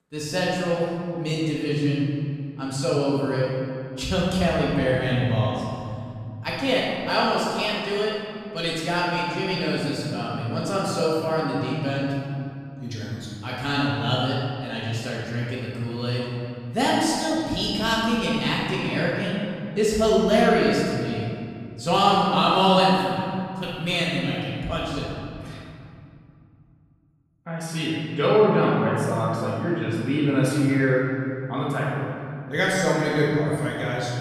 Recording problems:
room echo; strong; dies away in 2.3 s
off-mic speech; far

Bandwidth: 14.5 kHz